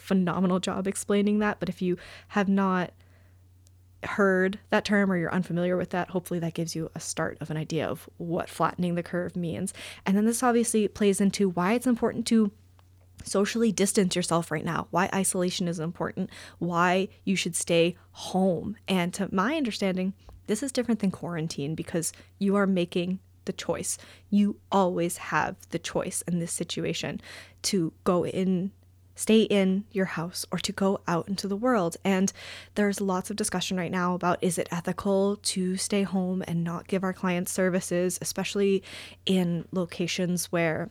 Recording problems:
none

